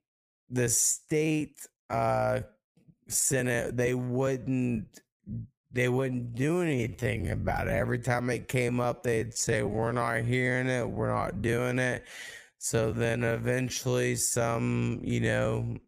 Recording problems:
wrong speed, natural pitch; too slow; 0.6 times normal speed
uneven, jittery; strongly; from 1 to 13 s

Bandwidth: 15 kHz